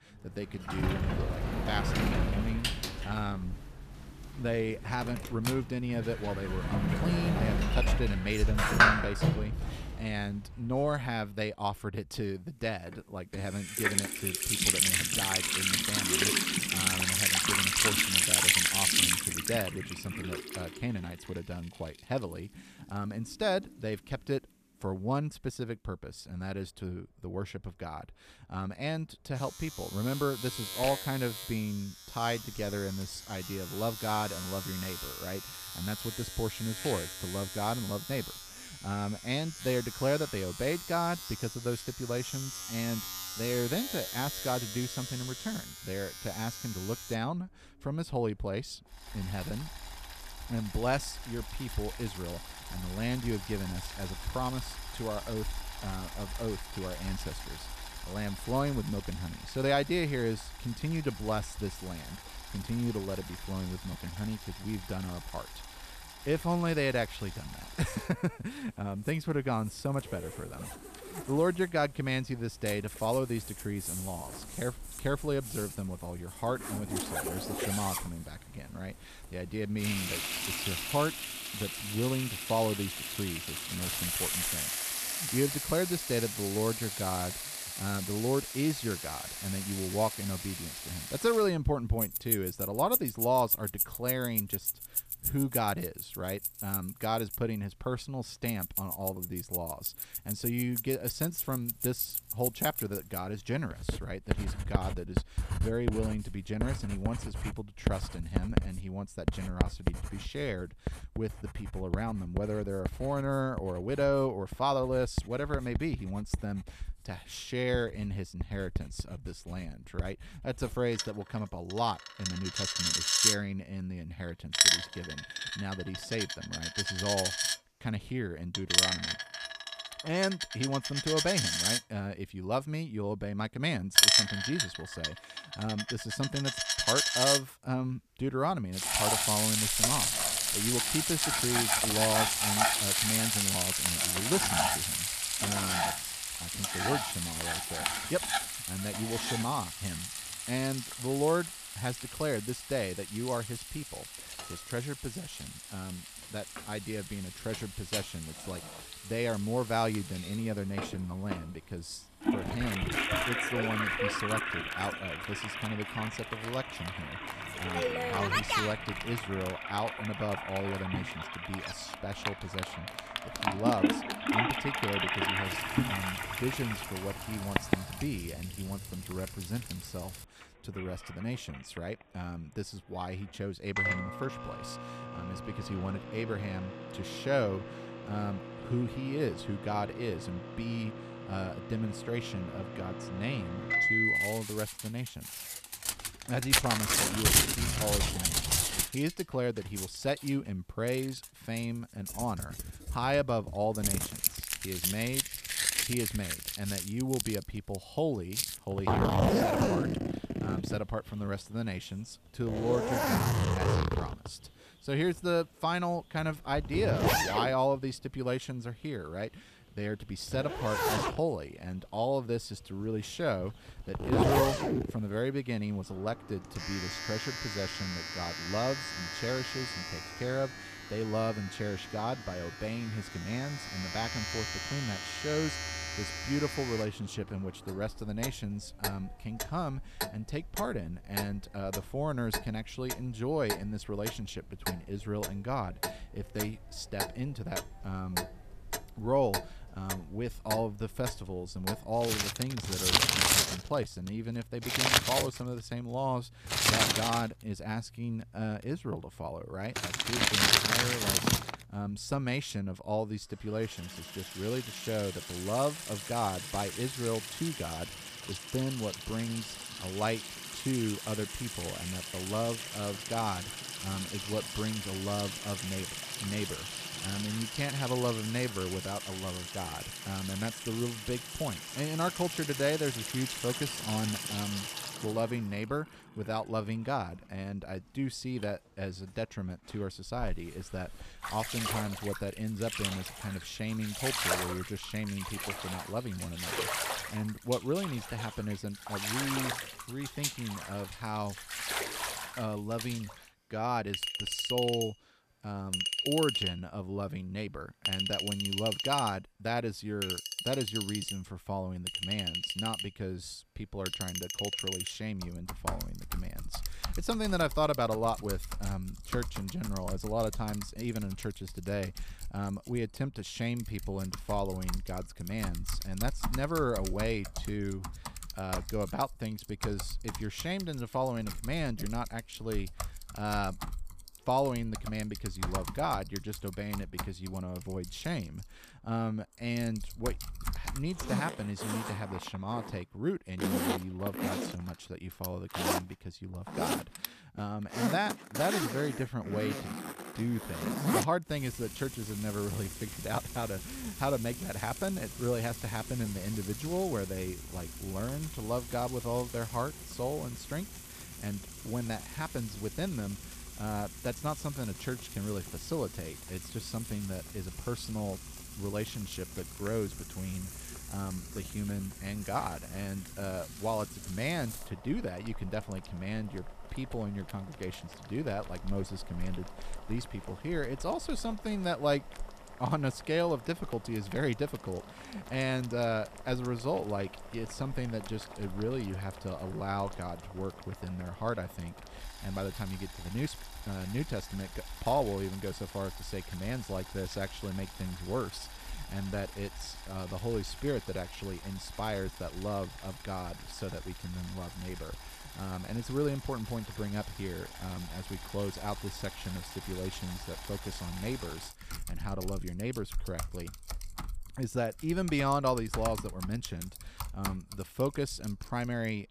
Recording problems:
household noises; very loud; throughout; 2 dB above the speech

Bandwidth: 14.5 kHz